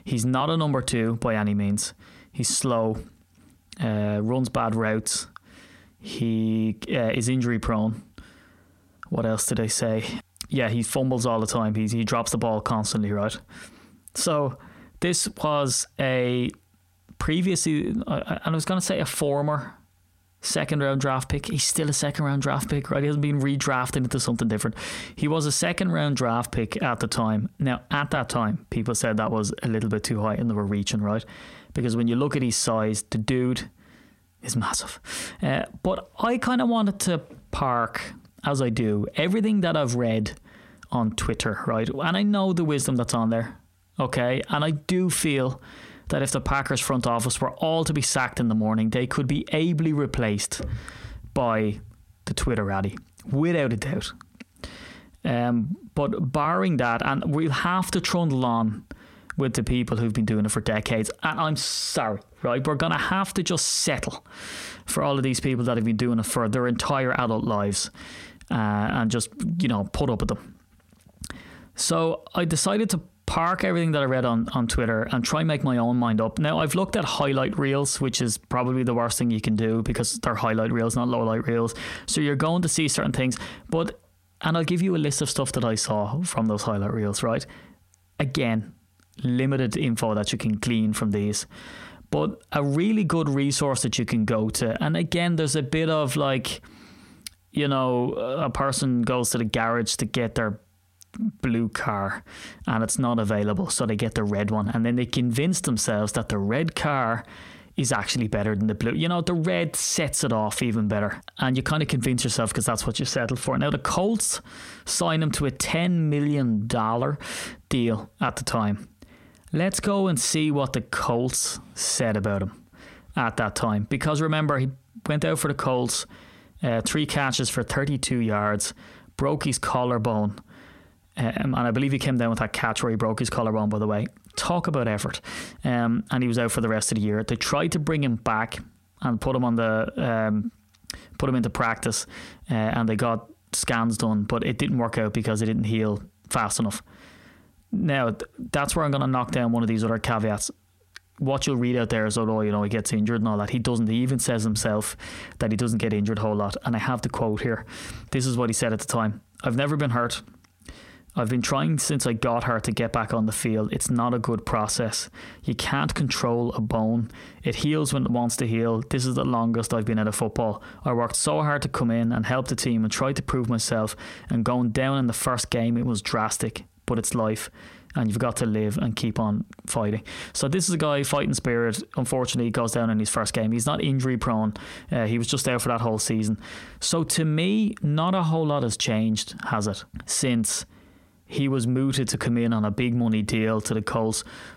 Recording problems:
squashed, flat; heavily

